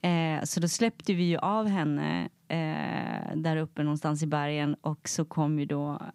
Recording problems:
none

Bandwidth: 15.5 kHz